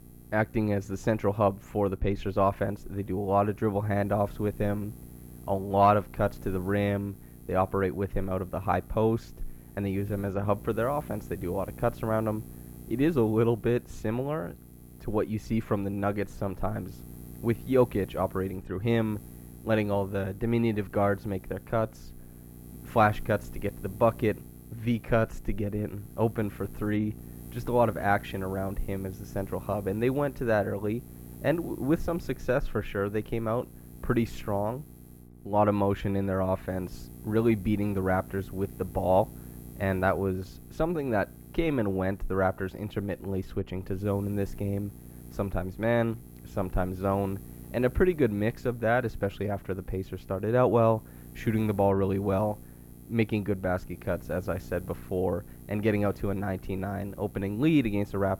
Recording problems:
muffled; very; fading above 3.5 kHz
electrical hum; faint; throughout; 60 Hz, 25 dB below the speech

